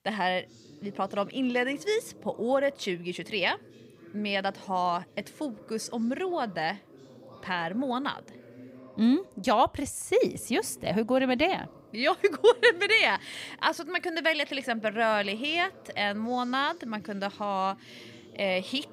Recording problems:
voice in the background; faint; throughout; 25 dB below the speech

